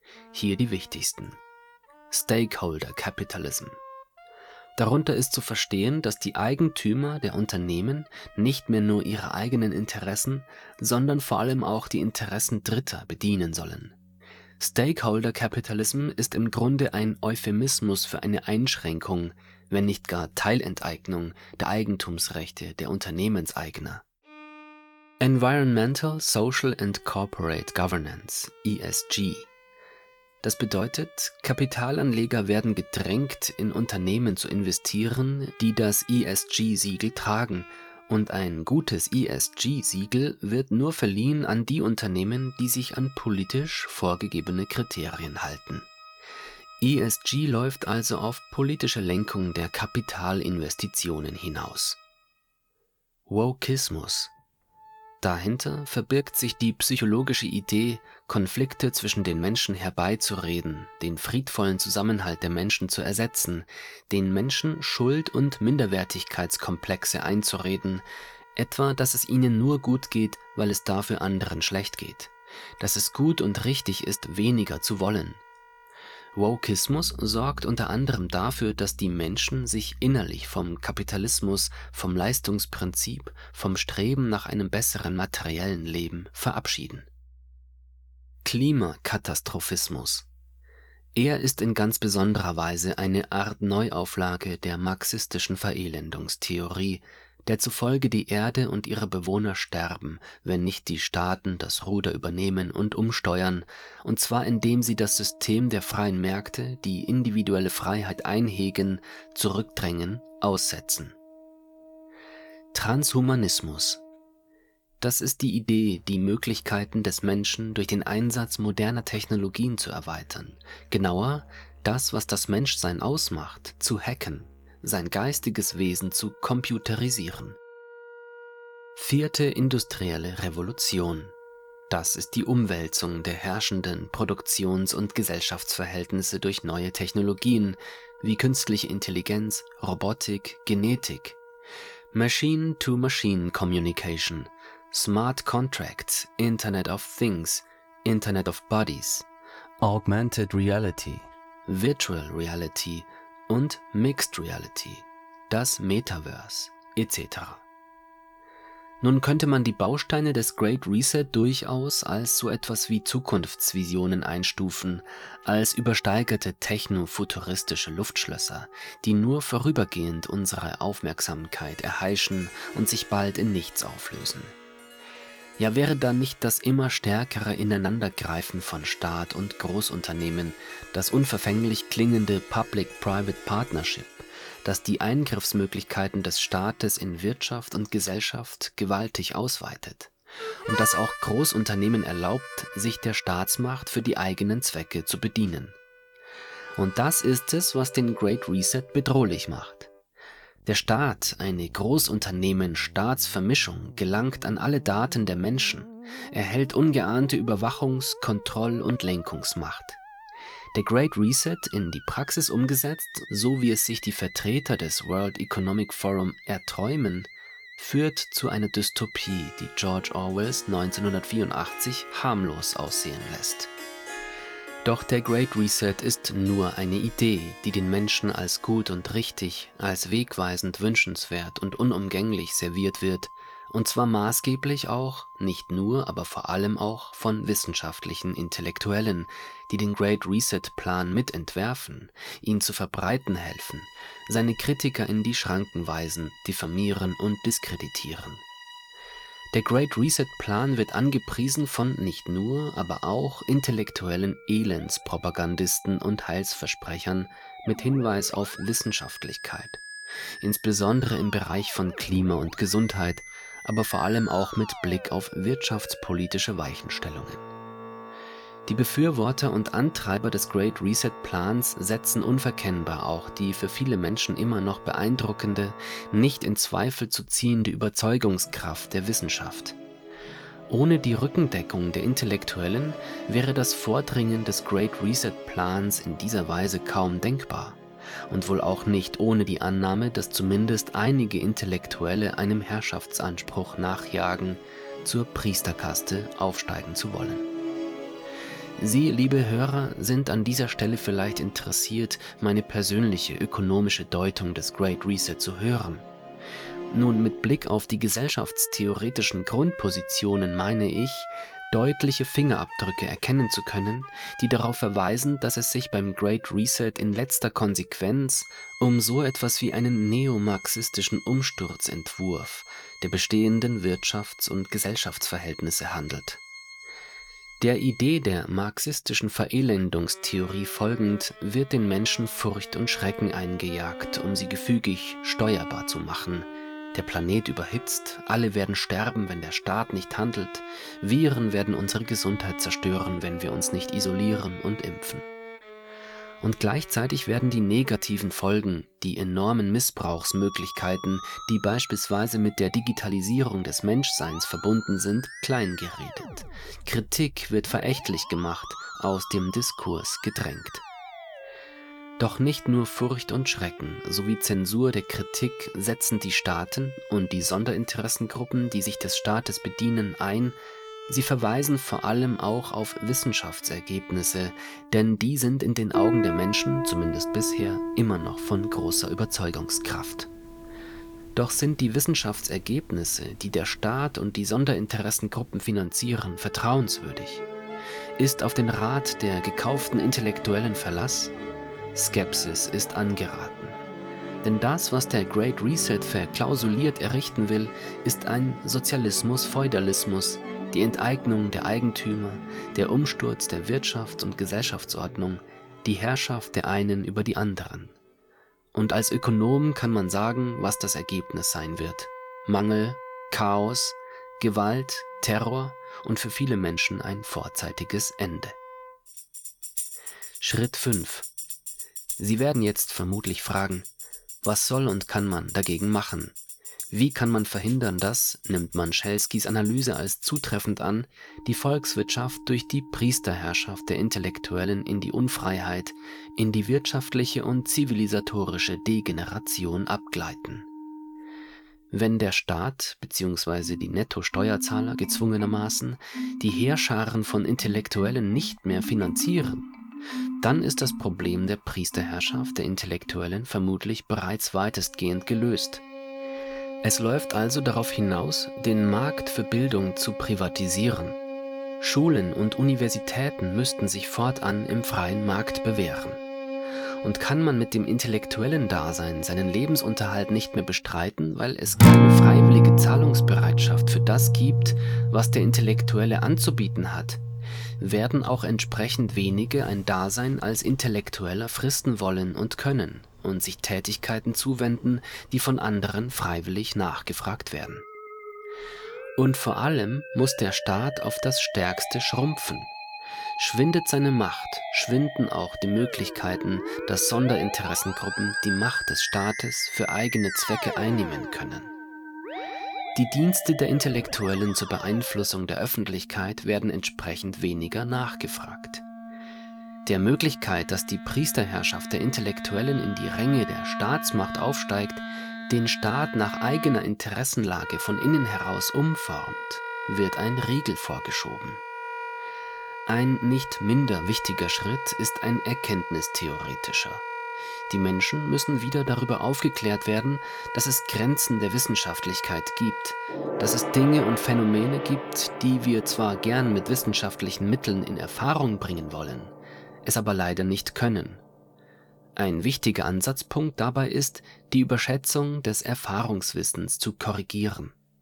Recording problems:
background music; loud; throughout; 7 dB below the speech

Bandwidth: 19 kHz